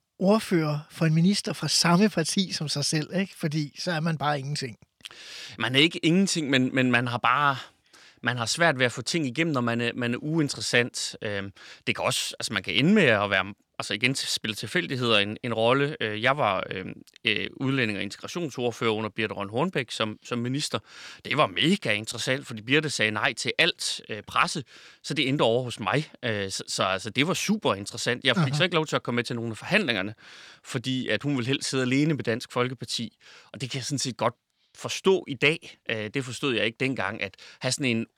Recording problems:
none

